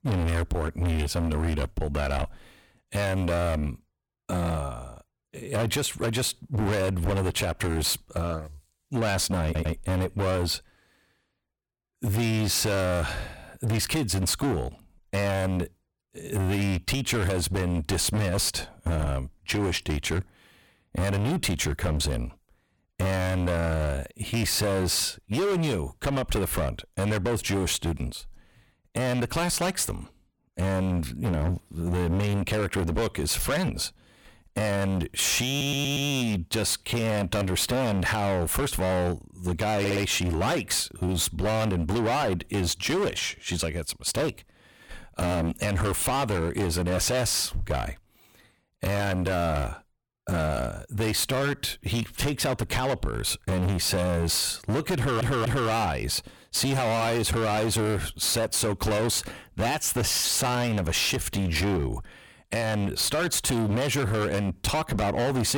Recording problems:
distortion; heavy; 24% of the sound clipped
audio stuttering; 4 times, first at 9.5 s
abrupt cut into speech; at the end

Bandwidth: 18 kHz